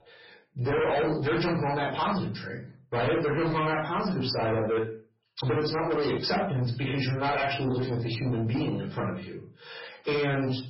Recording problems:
distortion; heavy; 6 dB below the speech
off-mic speech; far
garbled, watery; badly; nothing above 5.5 kHz
room echo; slight; dies away in 0.3 s

